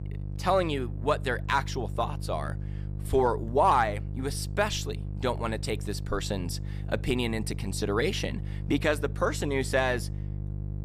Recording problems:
electrical hum; noticeable; throughout; 50 Hz, 20 dB below the speech

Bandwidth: 14.5 kHz